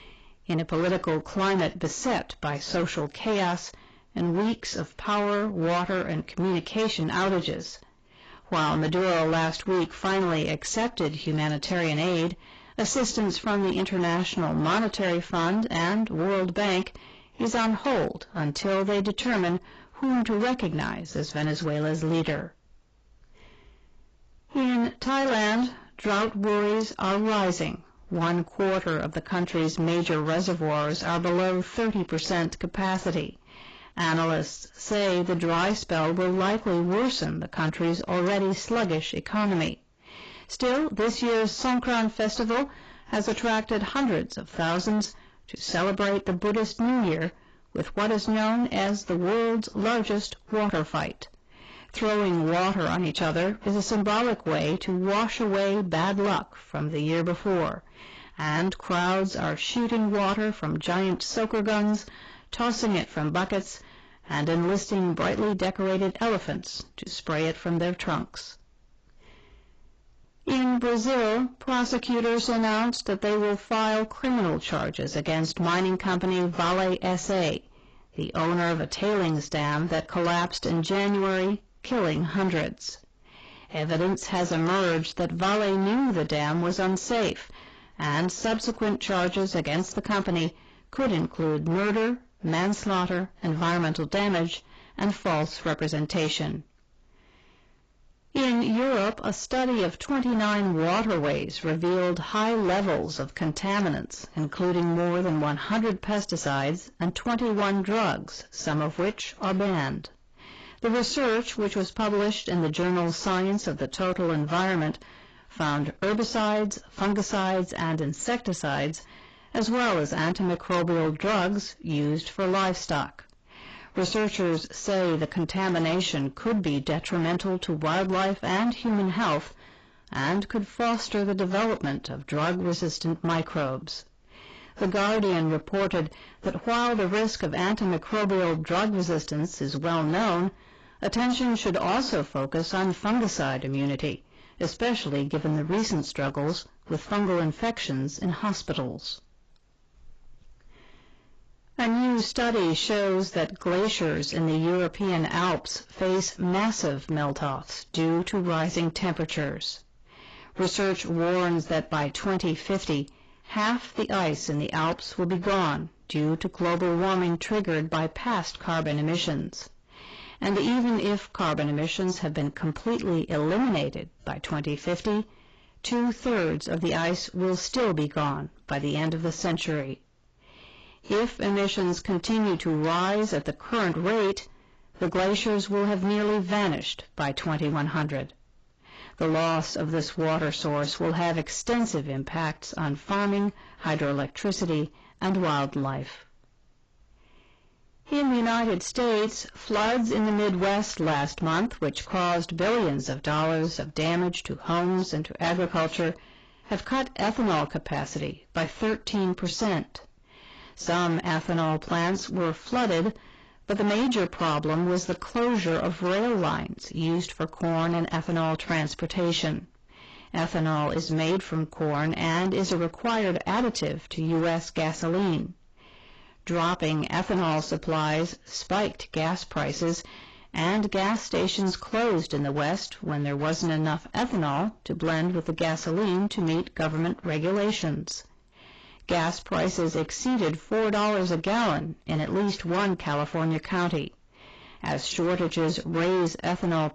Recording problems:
distortion; heavy; 19% of the sound clipped
garbled, watery; badly; nothing above 7.5 kHz

